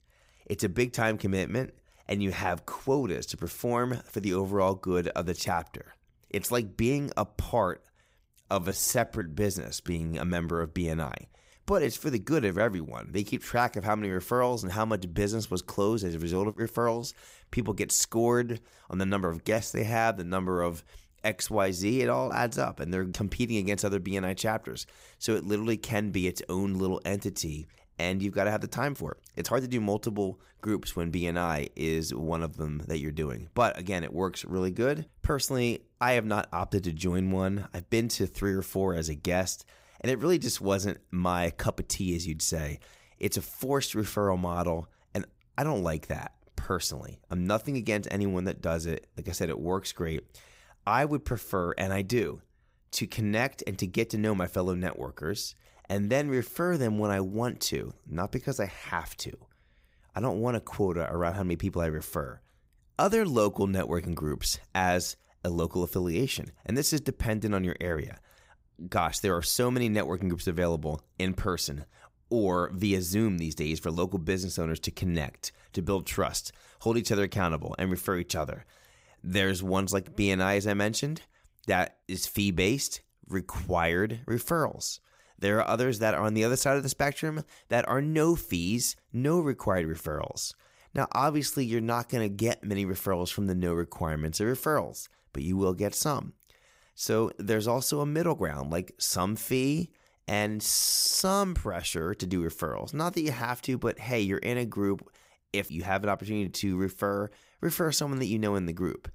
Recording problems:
uneven, jittery; strongly; from 1.5 to 47 s

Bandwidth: 15.5 kHz